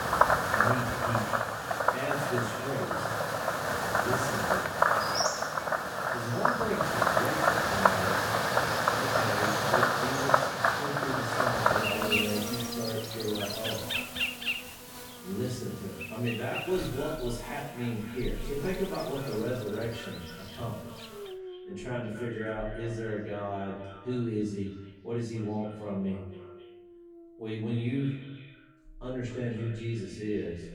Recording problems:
off-mic speech; far
echo of what is said; noticeable; throughout; 260 ms later, 15 dB below the speech
room echo; noticeable; dies away in 0.6 s
animal sounds; very loud; throughout; 7 dB above the speech

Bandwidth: 18 kHz